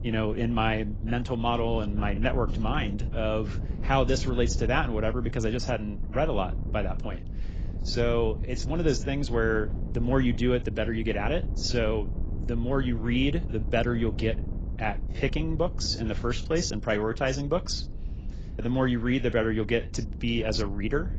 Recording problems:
garbled, watery; badly; nothing above 7.5 kHz
wind noise on the microphone; occasional gusts; 15 dB below the speech

